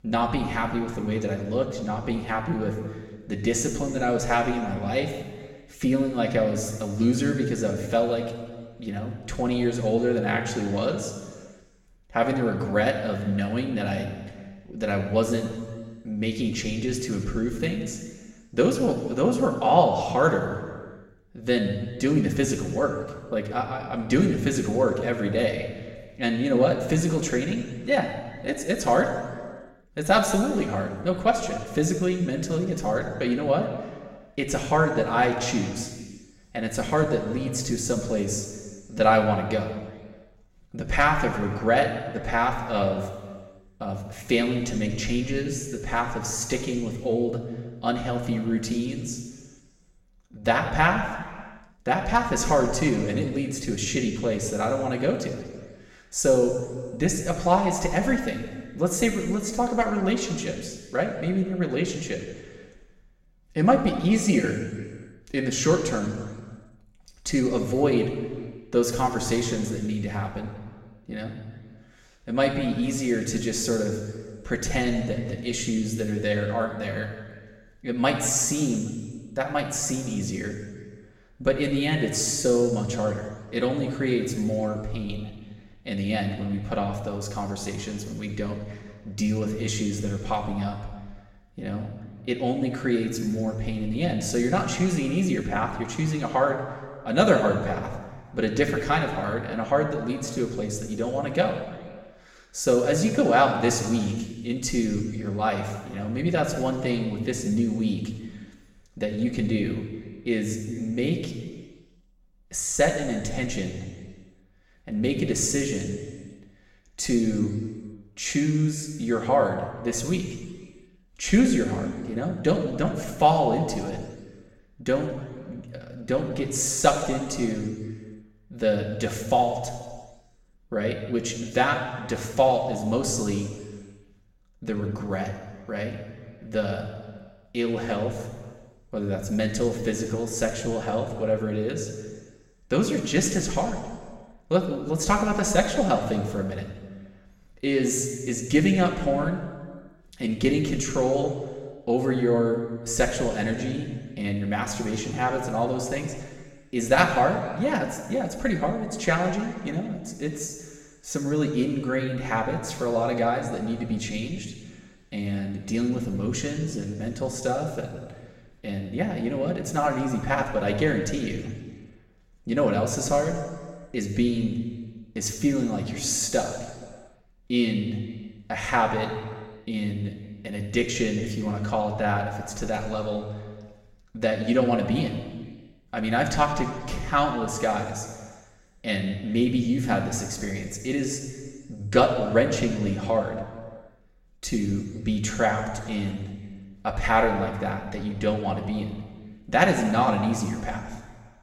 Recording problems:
room echo; noticeable; dies away in 1.4 s
off-mic speech; somewhat distant

